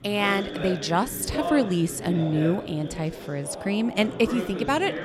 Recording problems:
background chatter; loud; throughout; 3 voices, 9 dB below the speech

